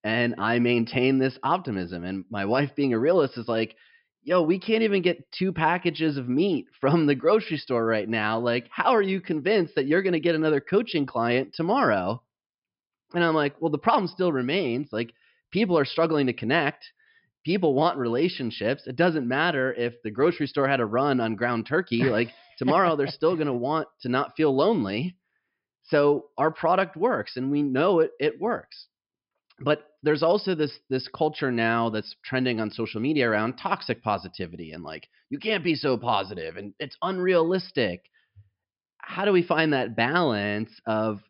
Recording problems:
high frequencies cut off; noticeable; nothing above 5.5 kHz

